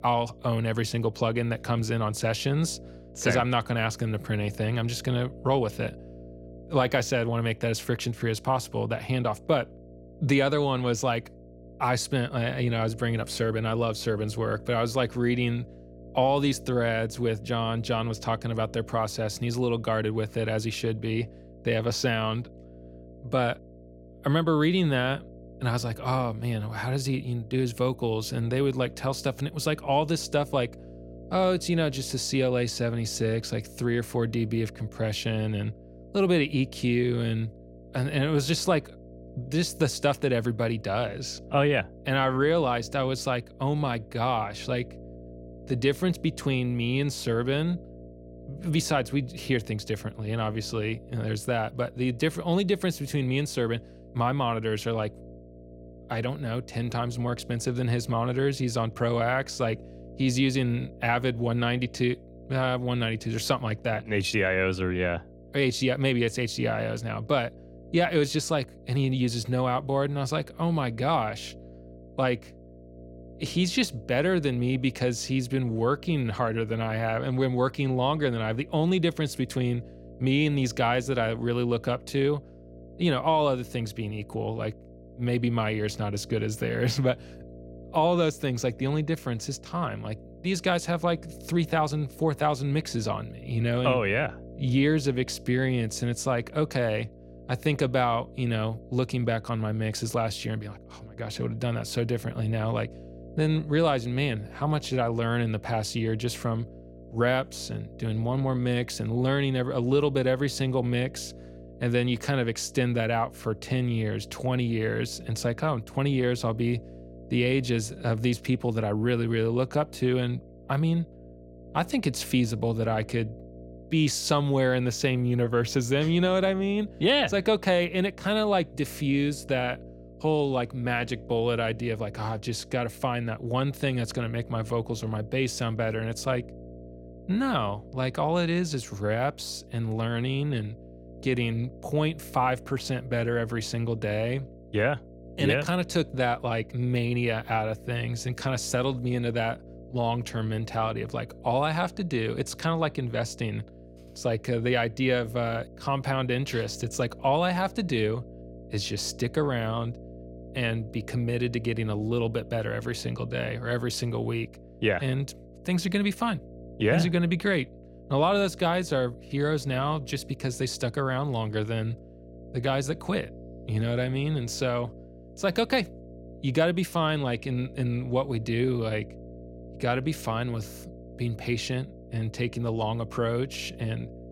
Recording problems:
electrical hum; faint; throughout; 60 Hz, 20 dB below the speech

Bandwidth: 16 kHz